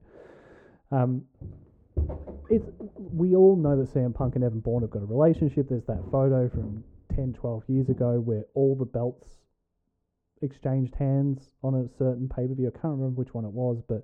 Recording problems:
muffled; very; fading above 1.5 kHz
footsteps; noticeable; from 1.5 to 8 s; peak 6 dB below the speech

